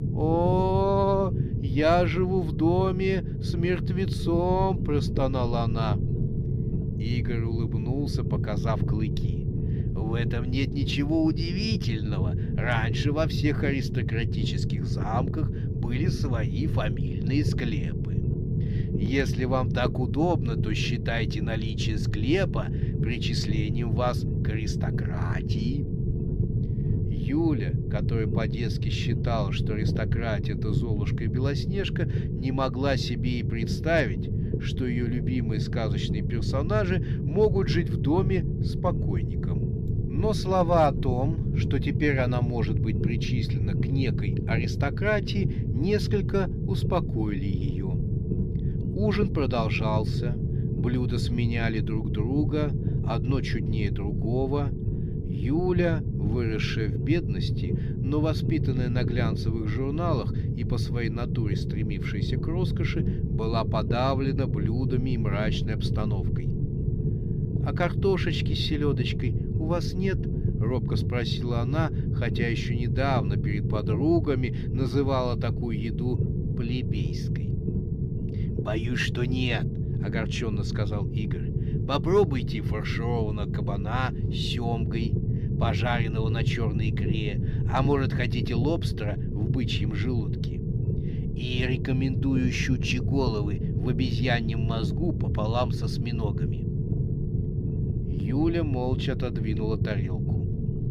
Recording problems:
low rumble; loud; throughout; 7 dB below the speech

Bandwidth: 15.5 kHz